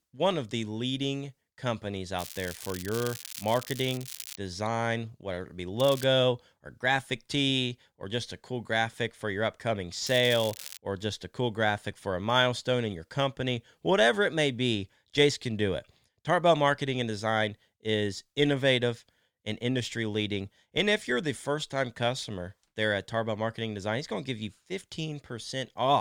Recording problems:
crackling; noticeable; from 2 to 4.5 s, at 6 s and at 10 s; 10 dB below the speech
abrupt cut into speech; at the end

